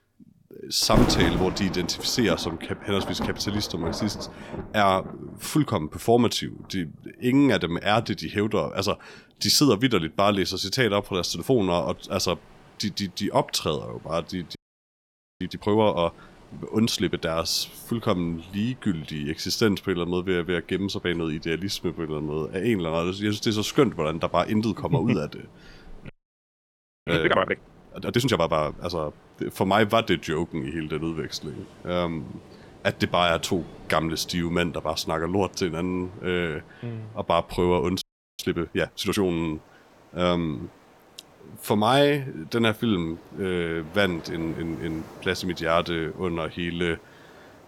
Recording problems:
rain or running water; noticeable; throughout; 10 dB below the speech
audio freezing; at 15 s for 1 s, at 26 s for 1 s and at 38 s

